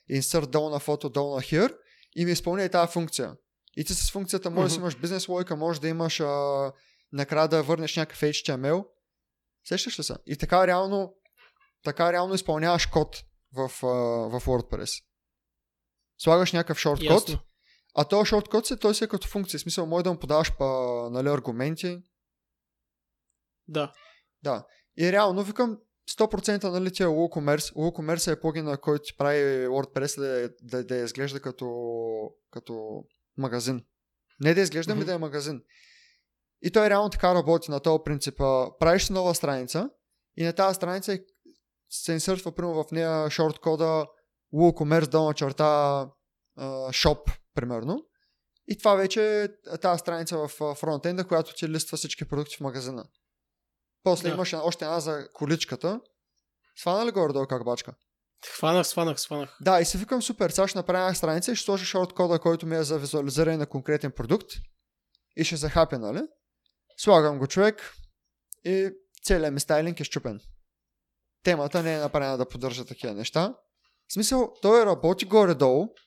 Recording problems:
none

